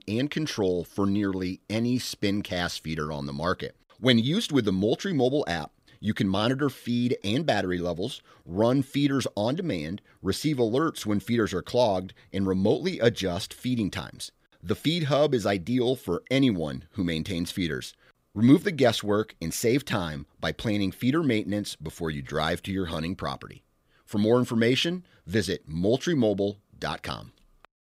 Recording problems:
none

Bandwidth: 15.5 kHz